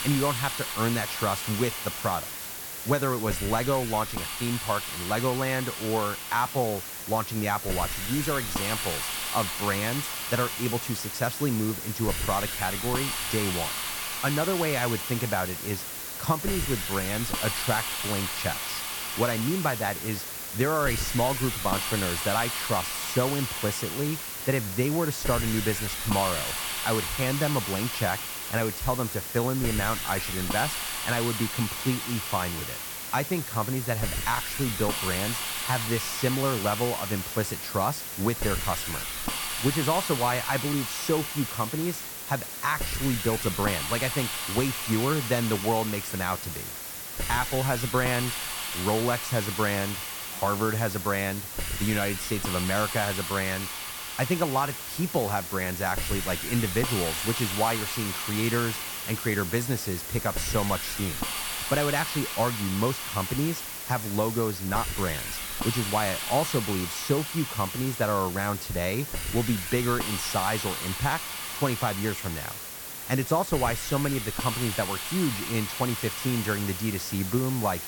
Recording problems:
hiss; loud; throughout; 2 dB below the speech

